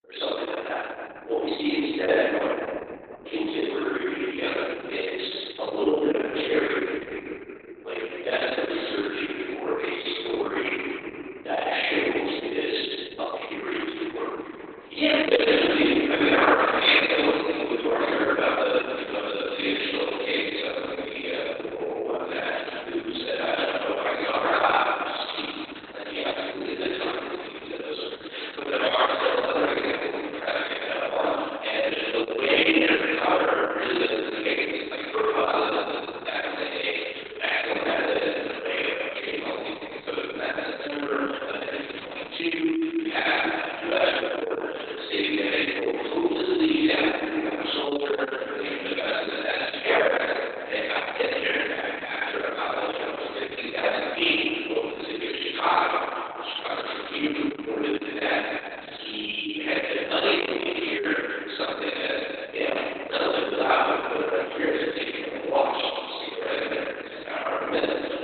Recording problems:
room echo; strong; dies away in 3 s
off-mic speech; far
garbled, watery; badly; nothing above 4 kHz
thin; somewhat; fading below 300 Hz

